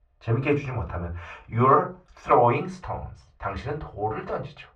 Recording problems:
off-mic speech; far
muffled; very; fading above 2 kHz
room echo; very slight; dies away in 0.2 s

